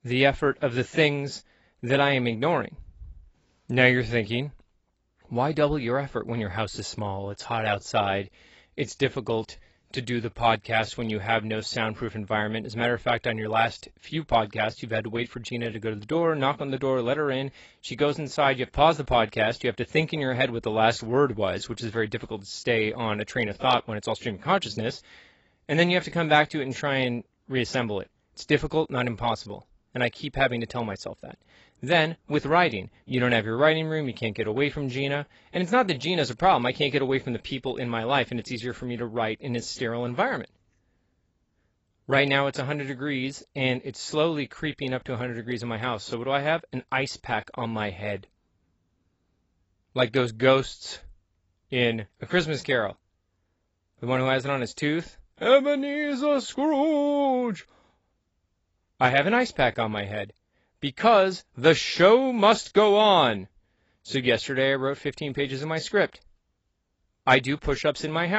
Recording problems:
garbled, watery; badly; nothing above 7.5 kHz
abrupt cut into speech; at the end

